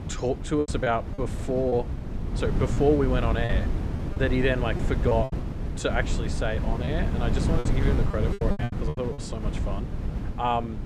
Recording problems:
wind noise on the microphone; heavy; 9 dB below the speech
choppy; very; 9% of the speech affected

